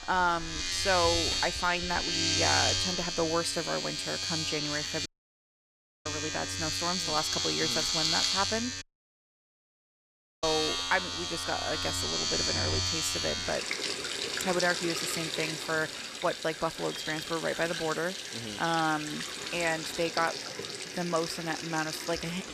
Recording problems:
household noises; very loud; throughout; 1 dB above the speech
audio cutting out; at 5 s for 1 s and at 9 s for 1.5 s

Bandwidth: 14.5 kHz